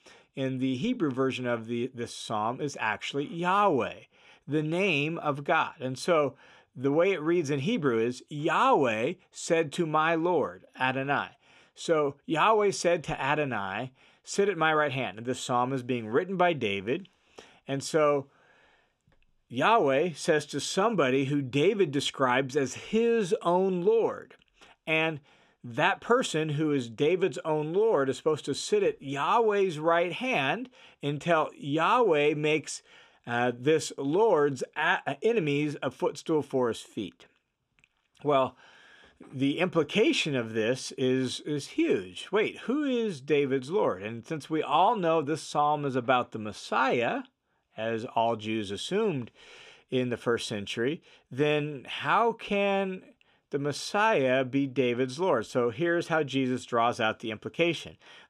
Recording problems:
none

